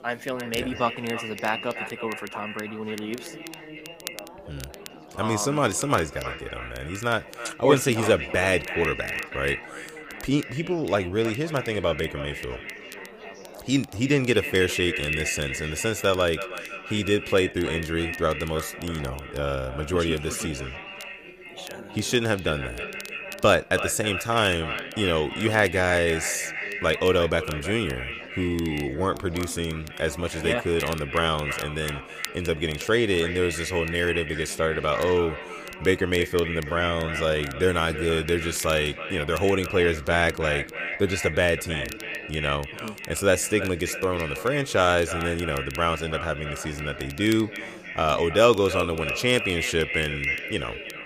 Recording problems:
echo of what is said; strong; throughout; 320 ms later, 8 dB below the speech
background chatter; noticeable; throughout; 4 voices, 20 dB below the speech
crackle, like an old record; faint; 20 dB below the speech

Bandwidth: 15 kHz